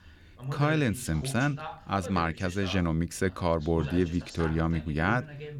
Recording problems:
voice in the background; noticeable; throughout; 10 dB below the speech

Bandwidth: 18 kHz